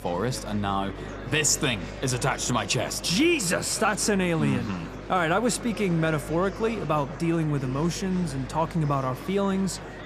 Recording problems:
echo of what is said; faint; throughout; 160 ms later, 25 dB below the speech
murmuring crowd; noticeable; throughout; 15 dB below the speech
electrical hum; faint; throughout; 50 Hz, 30 dB below the speech

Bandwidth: 14.5 kHz